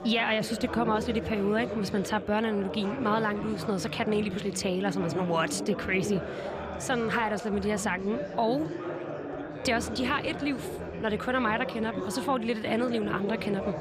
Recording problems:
chatter from many people; loud; throughout; 7 dB below the speech

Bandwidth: 15 kHz